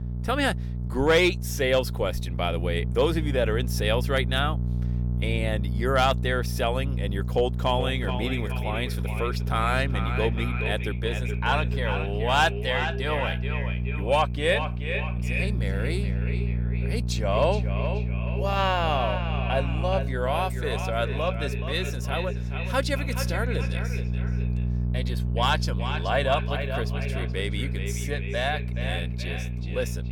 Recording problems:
echo of what is said; strong; from 7.5 s on; 430 ms later, 8 dB below the speech
electrical hum; noticeable; throughout; 60 Hz, 15 dB below the speech

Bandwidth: 17.5 kHz